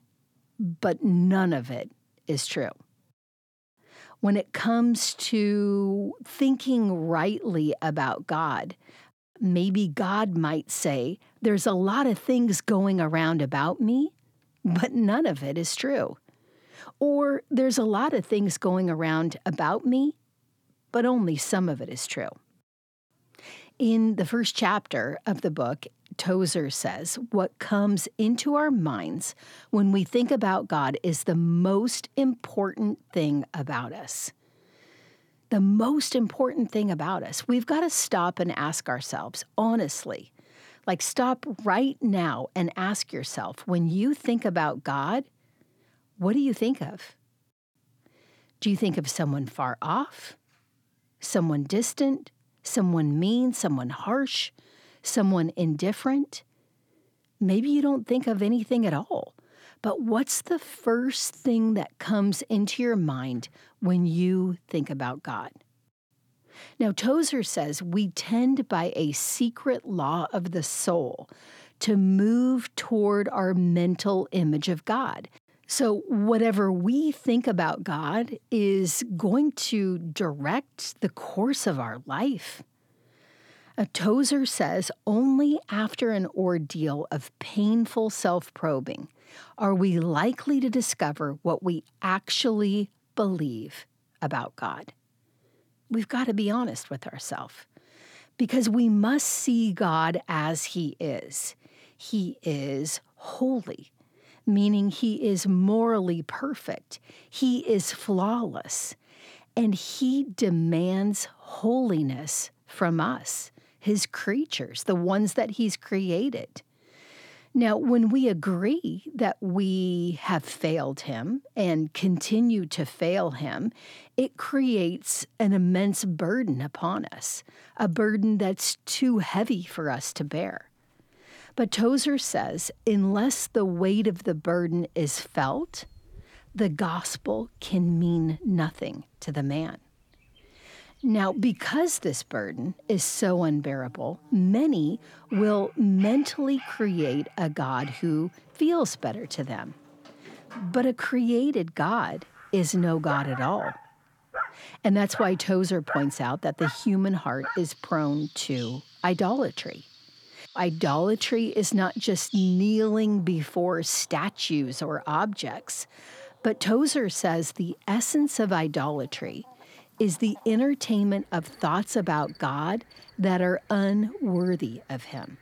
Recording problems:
animal sounds; noticeable; from 2:09 on; 15 dB below the speech

